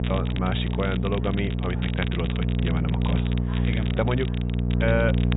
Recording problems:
high frequencies cut off; severe; nothing above 4 kHz
electrical hum; loud; throughout; 60 Hz, 6 dB below the speech
background chatter; noticeable; throughout; 4 voices, 20 dB below the speech
crackle, like an old record; noticeable; 10 dB below the speech

